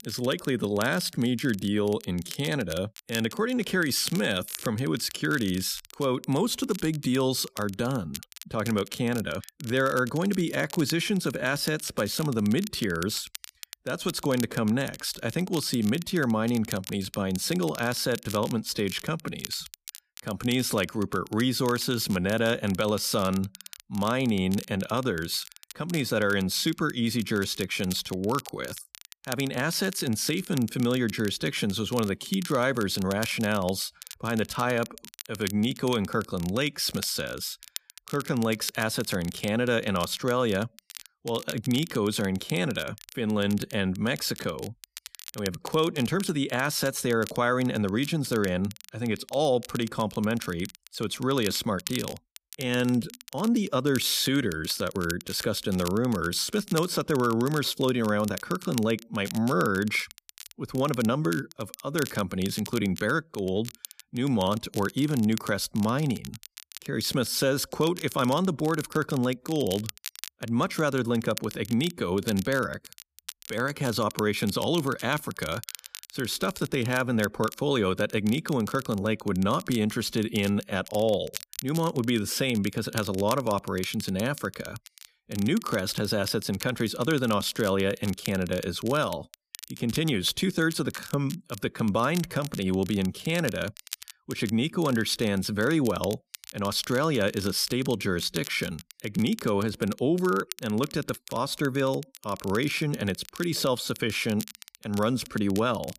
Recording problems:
crackle, like an old record; noticeable; 15 dB below the speech

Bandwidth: 14.5 kHz